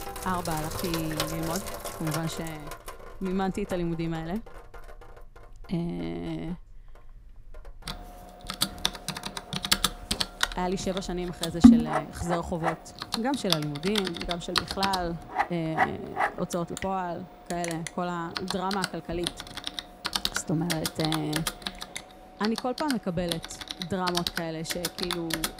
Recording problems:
household noises; very loud; throughout; 2 dB above the speech

